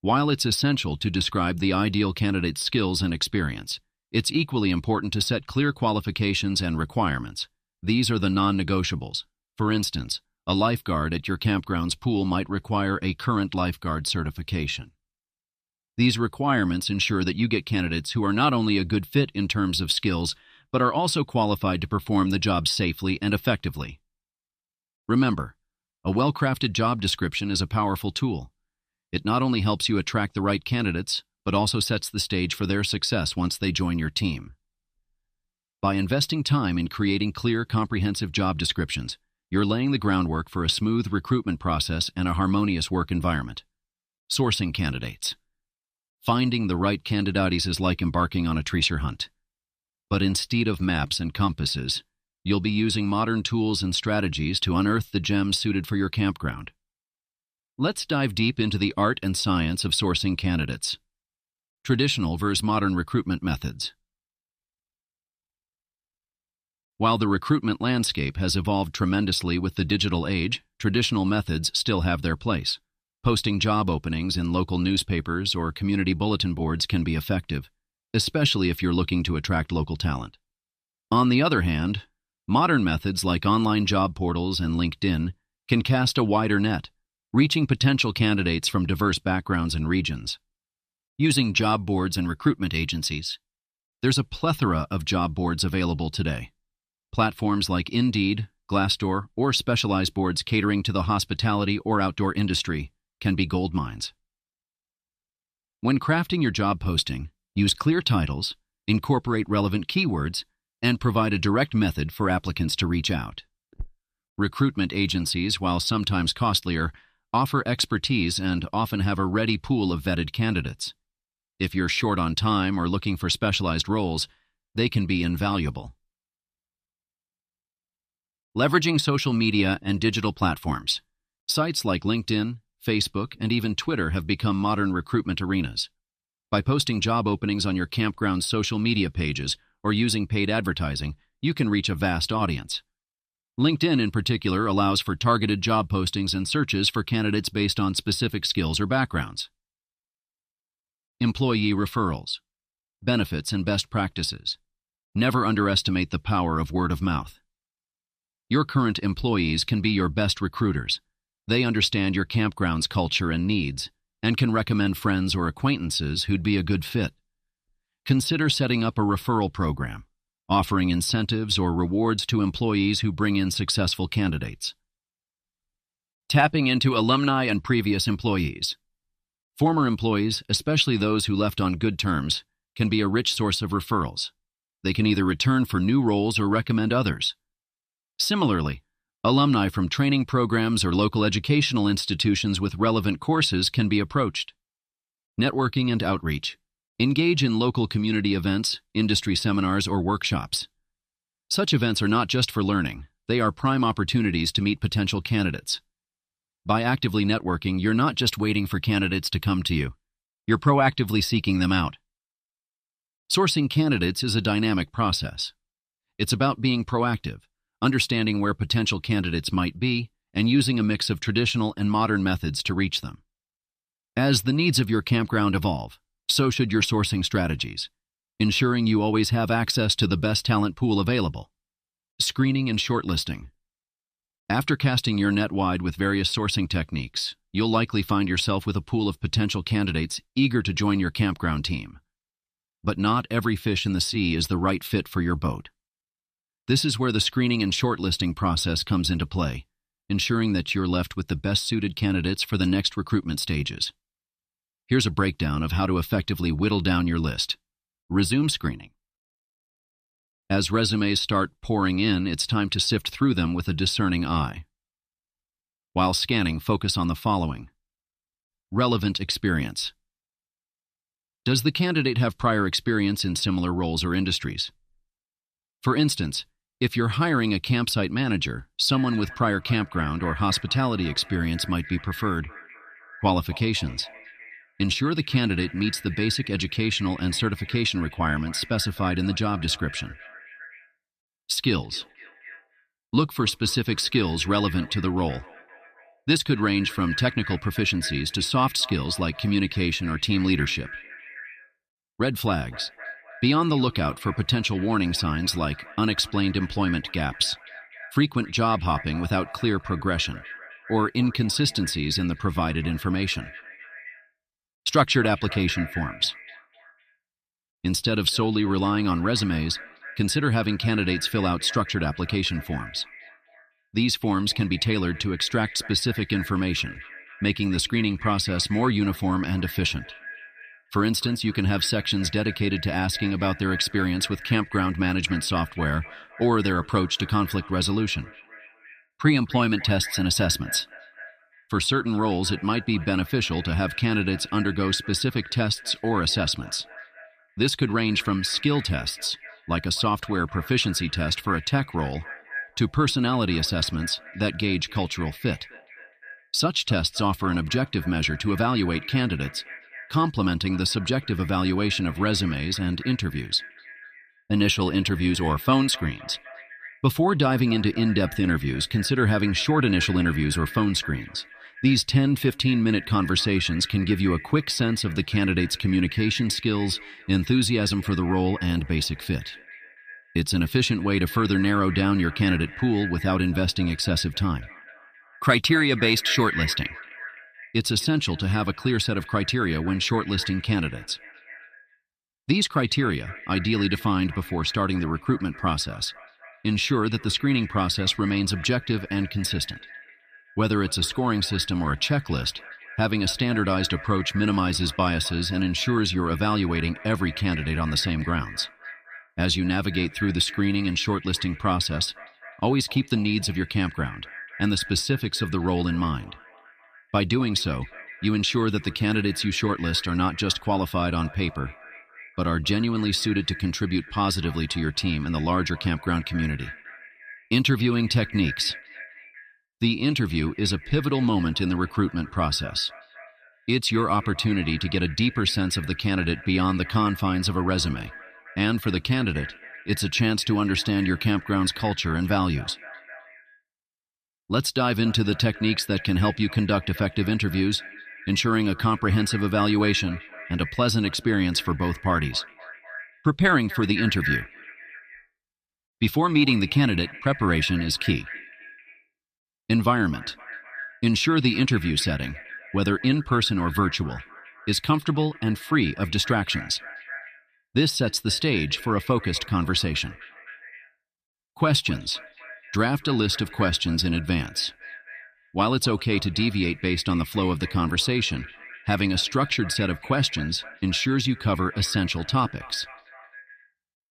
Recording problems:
echo of what is said; noticeable; from 4:39 on; 260 ms later, 15 dB below the speech

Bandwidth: 14.5 kHz